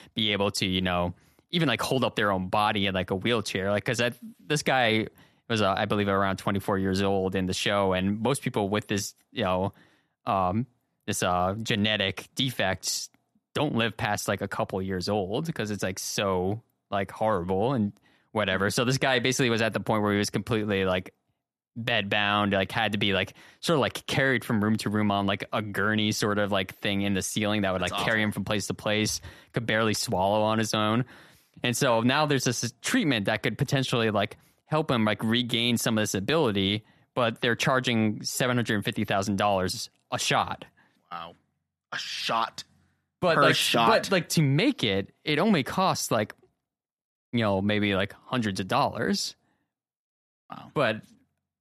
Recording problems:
none

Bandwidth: 13.5 kHz